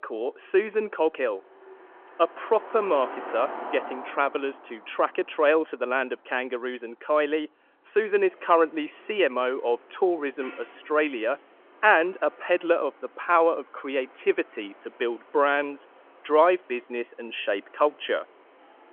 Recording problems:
phone-call audio
traffic noise; noticeable; throughout; 20 dB below the speech

